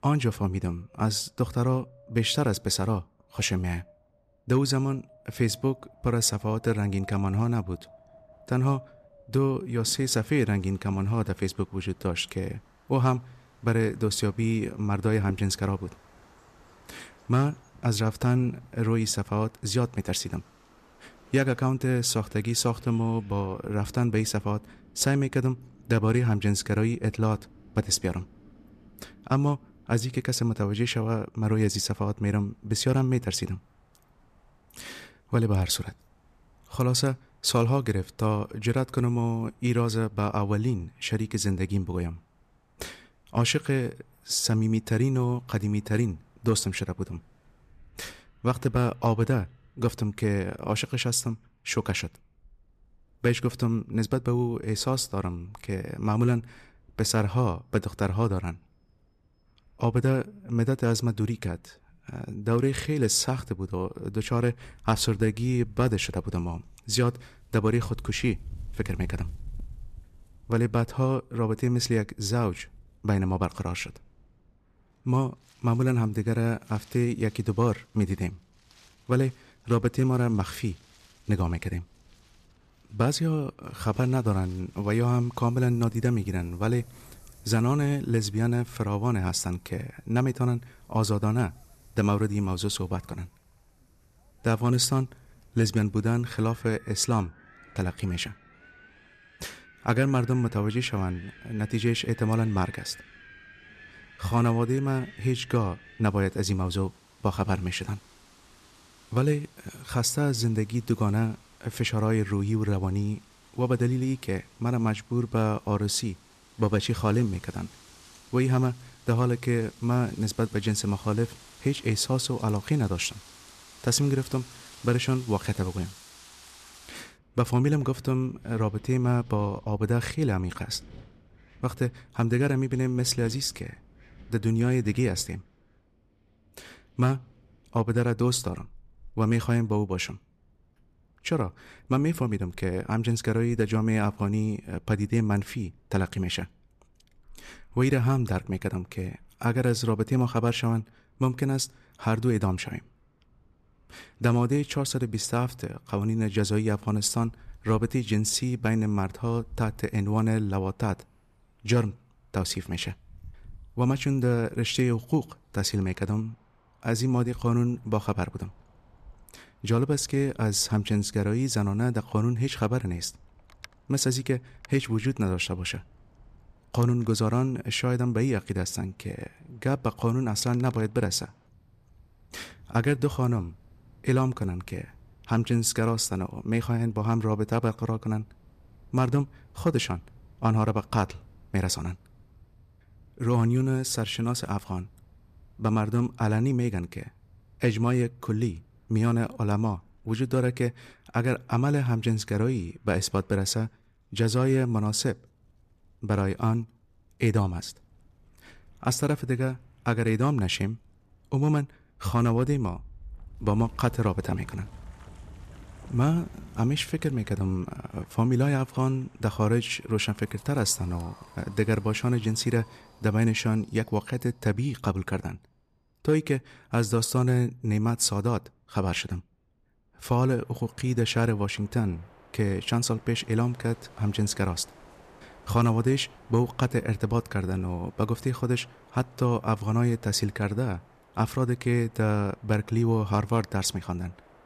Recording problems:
wind in the background; faint; throughout; 25 dB below the speech

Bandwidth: 14 kHz